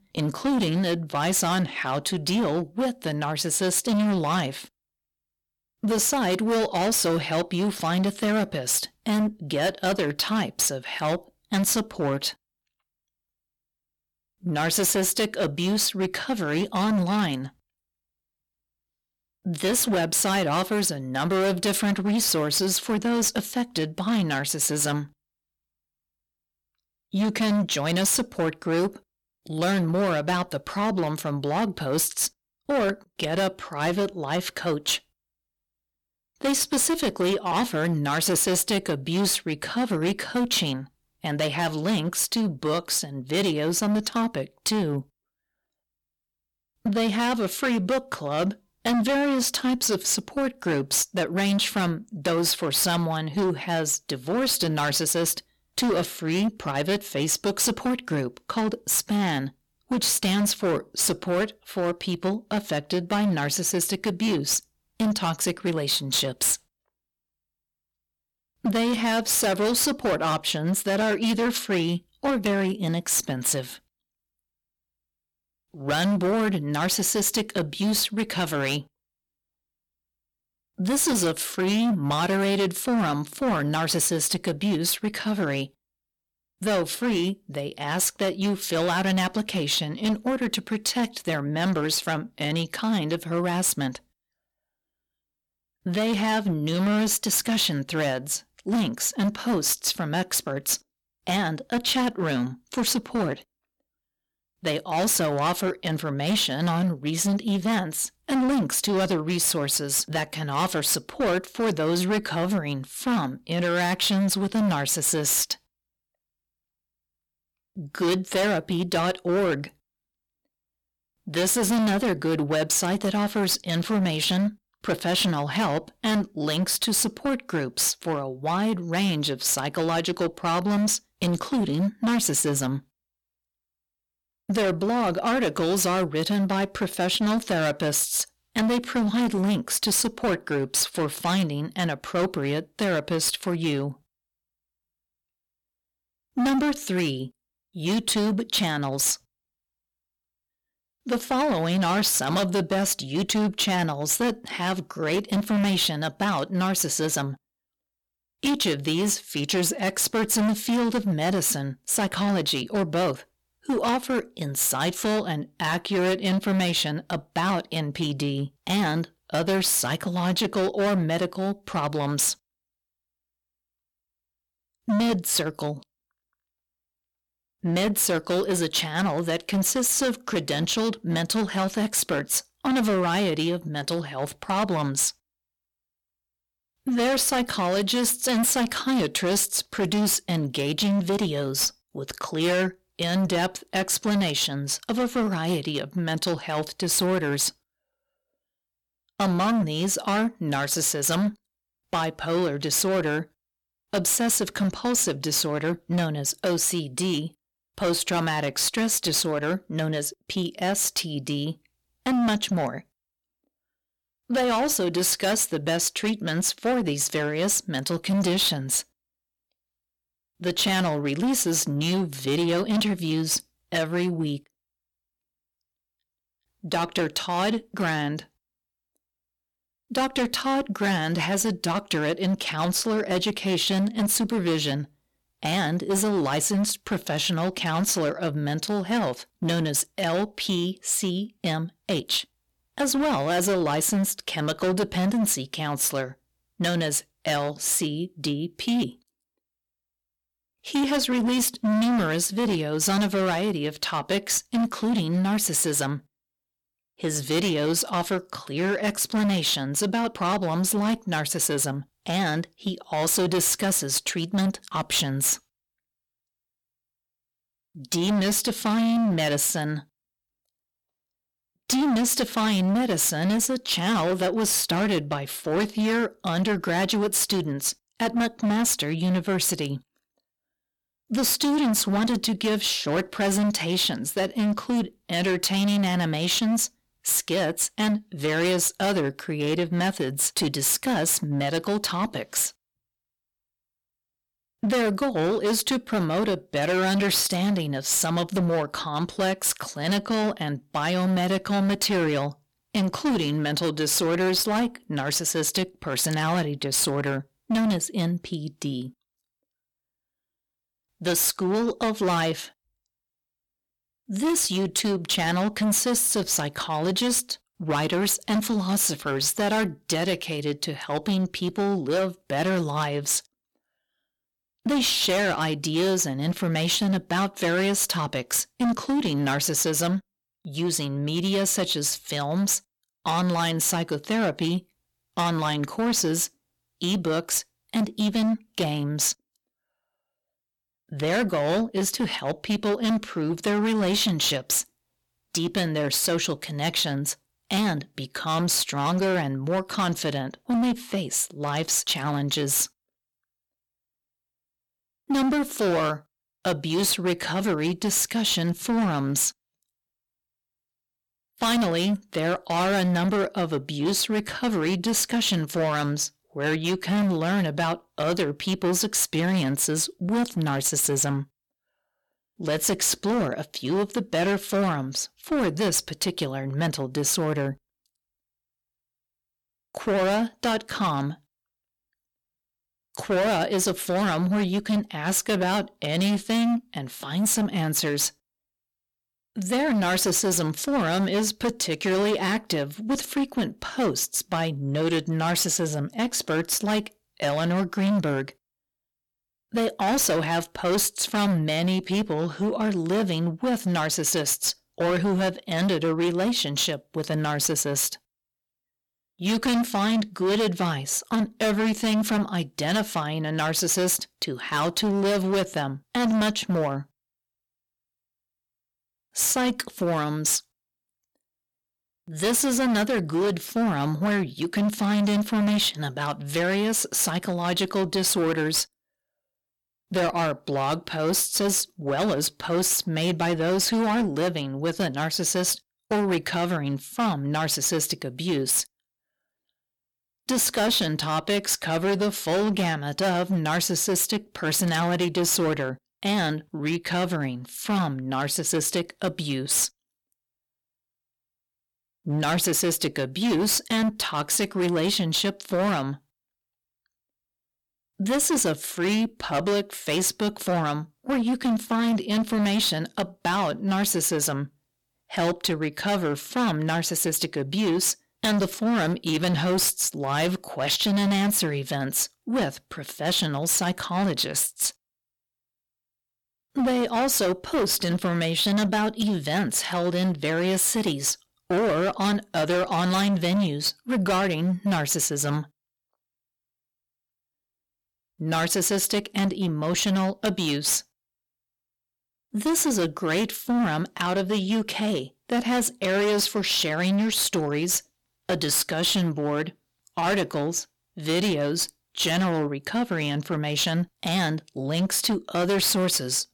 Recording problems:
distortion; heavy; 16% of the sound clipped

